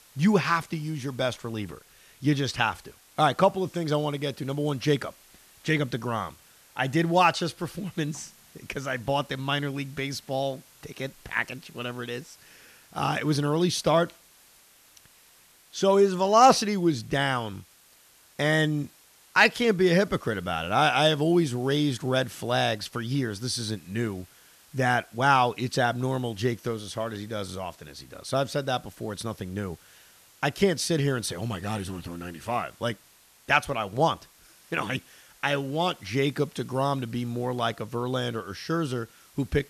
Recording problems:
hiss; faint; throughout; 25 dB below the speech

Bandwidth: 14 kHz